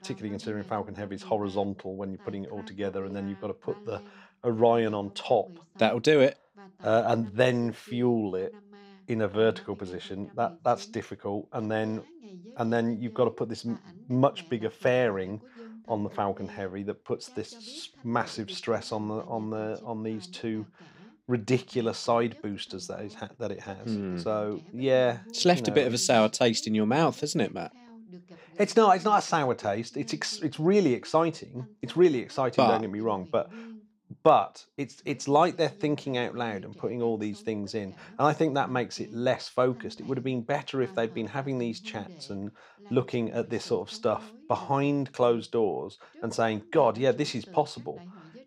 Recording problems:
voice in the background; faint; throughout; 20 dB below the speech

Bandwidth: 15.5 kHz